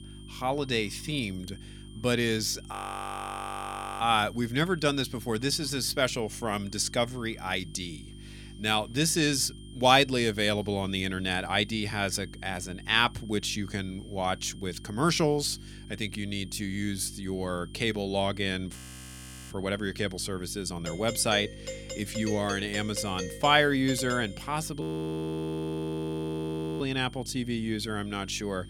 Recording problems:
electrical hum; faint; throughout; 50 Hz, 25 dB below the speech
high-pitched whine; faint; throughout; 3 kHz, 25 dB below the speech
audio freezing; at 2.5 s for 1.5 s, at 19 s for 1 s and at 25 s for 2 s
doorbell; noticeable; from 21 to 24 s; peak 8 dB below the speech

